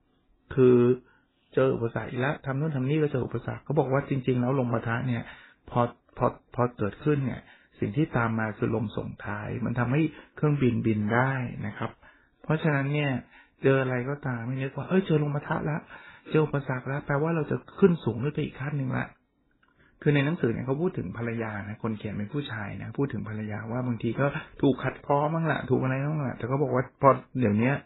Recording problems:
garbled, watery; badly; nothing above 4 kHz
uneven, jittery; strongly; from 2.5 to 21 s

